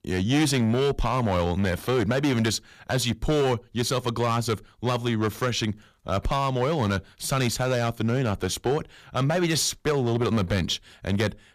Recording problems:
distortion; slight; 9% of the sound clipped

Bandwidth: 14.5 kHz